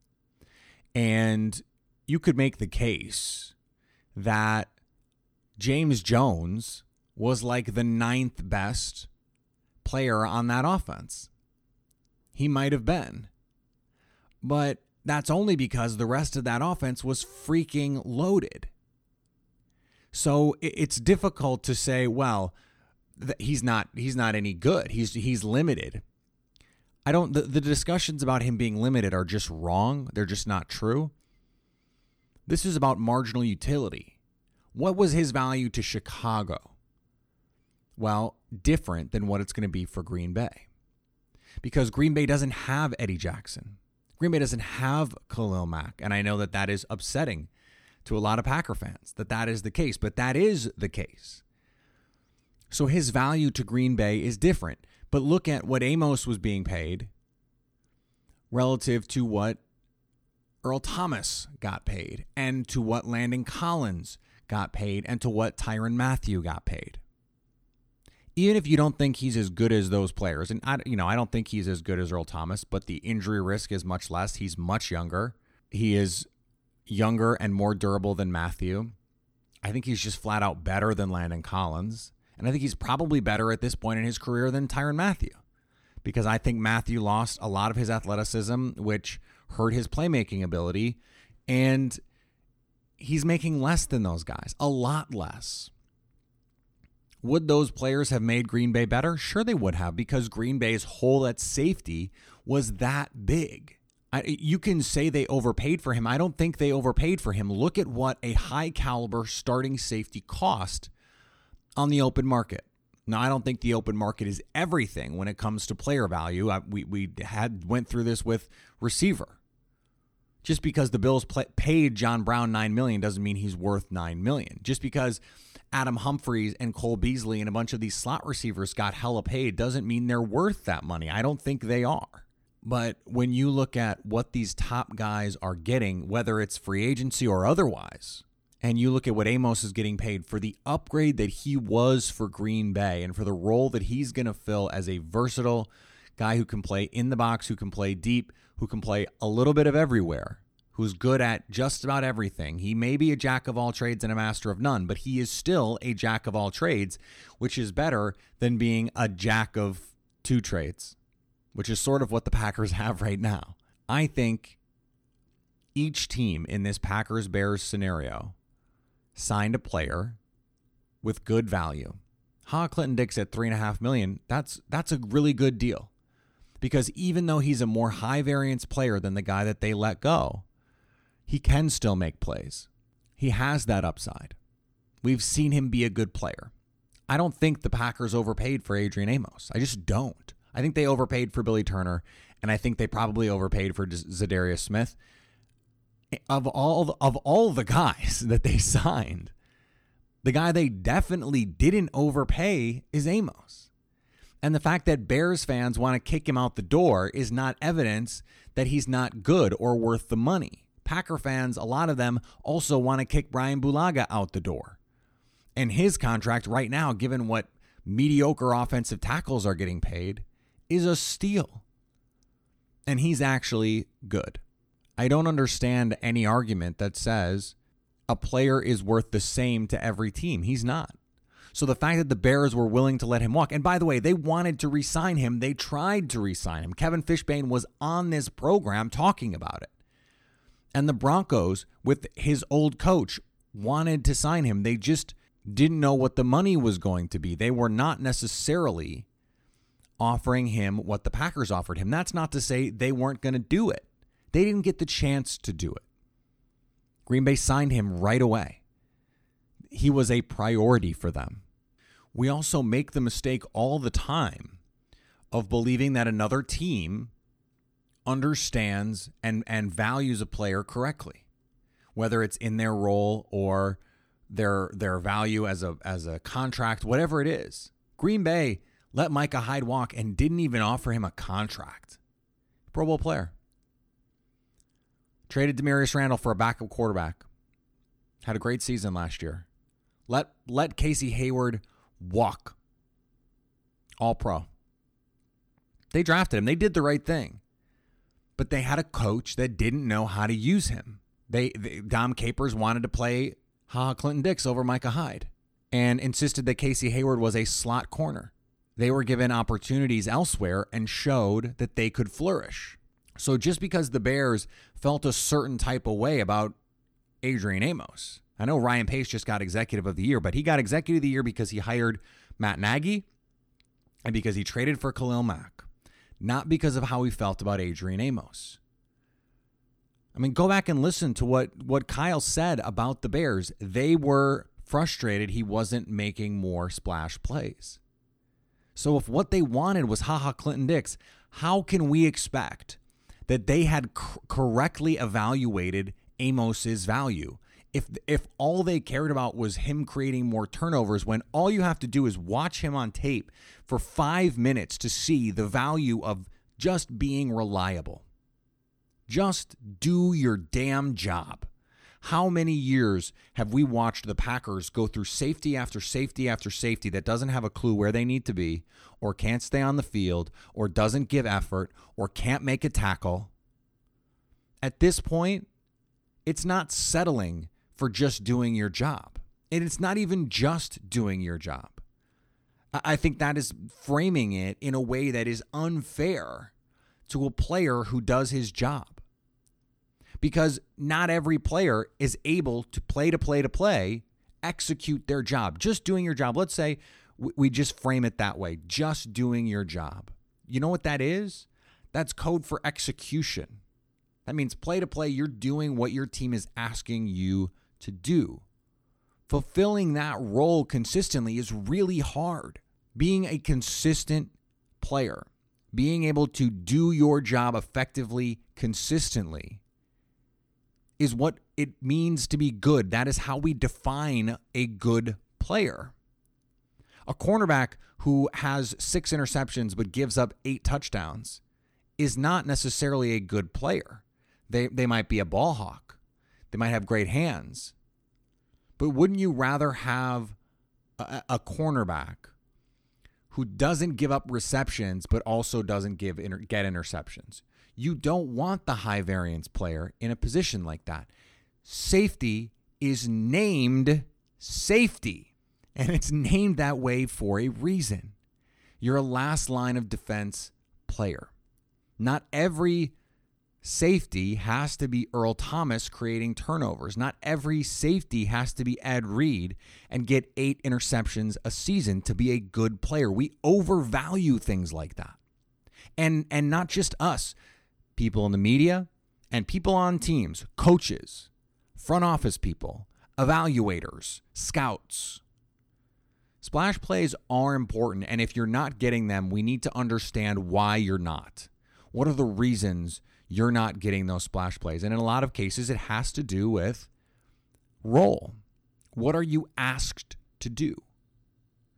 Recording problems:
none

